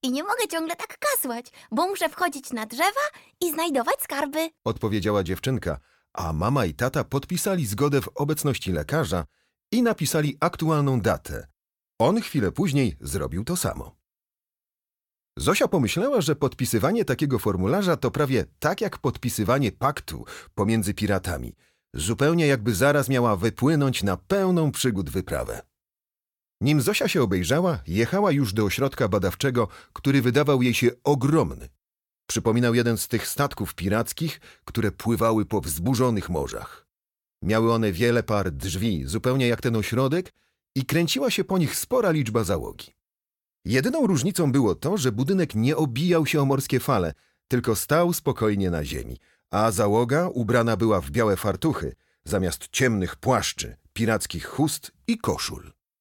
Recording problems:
none

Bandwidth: 17 kHz